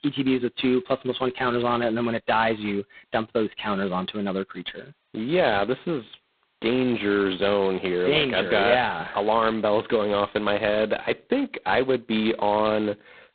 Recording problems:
phone-call audio; poor line; nothing above 4 kHz

